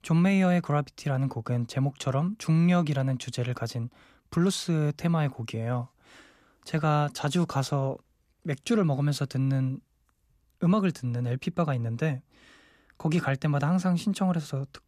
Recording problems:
none

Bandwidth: 14.5 kHz